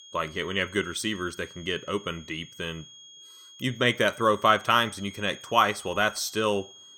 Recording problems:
high-pitched whine; noticeable; throughout; 3.5 kHz, 20 dB below the speech

